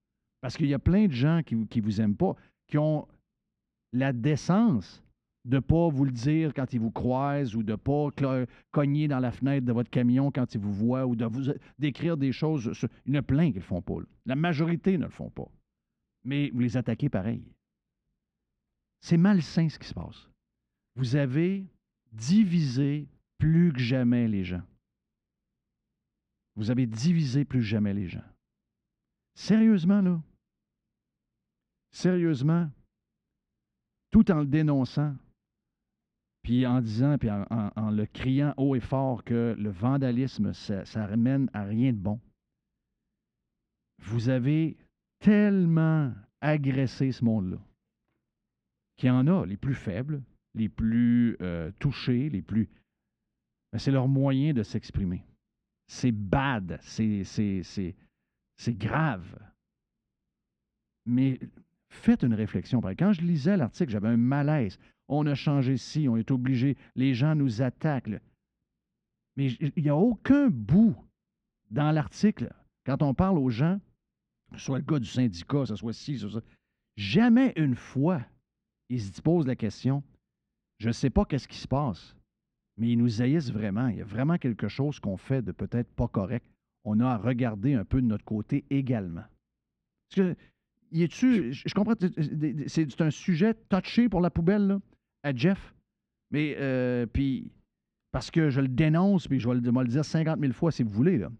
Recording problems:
muffled; slightly; fading above 3 kHz

